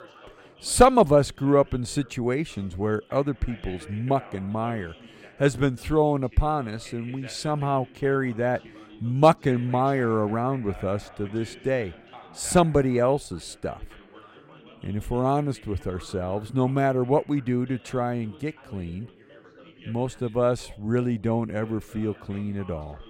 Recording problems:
background chatter; faint; throughout; 2 voices, 20 dB below the speech

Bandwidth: 16 kHz